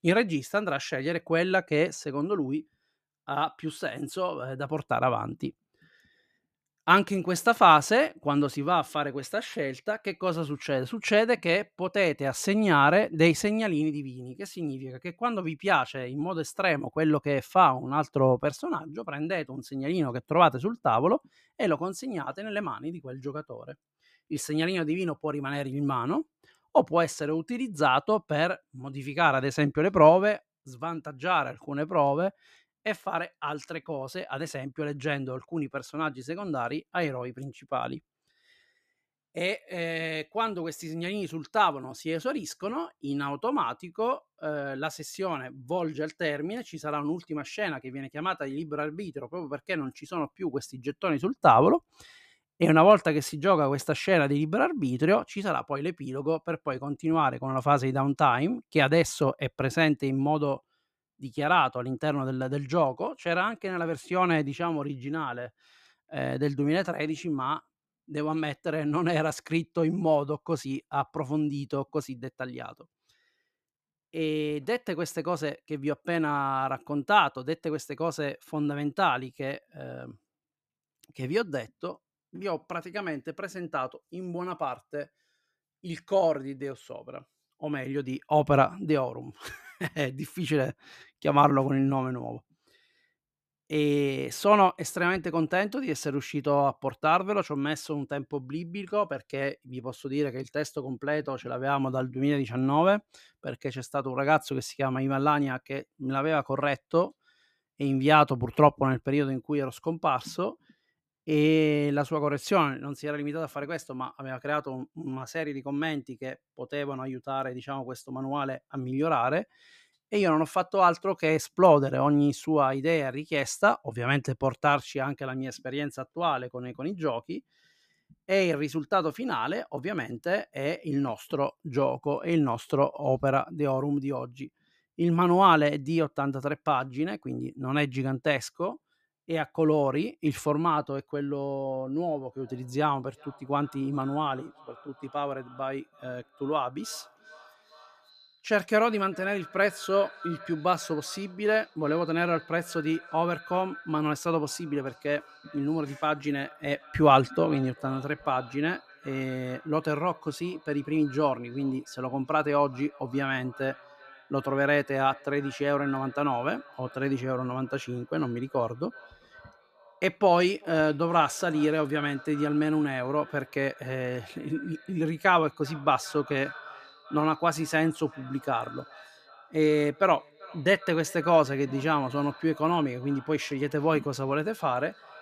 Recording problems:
echo of what is said; faint; from 2:22 on; 390 ms later, 20 dB below the speech

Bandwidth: 14.5 kHz